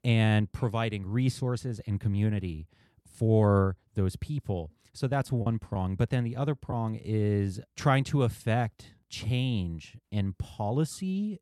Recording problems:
choppy; occasionally; from 5.5 to 6.5 s; 3% of the speech affected

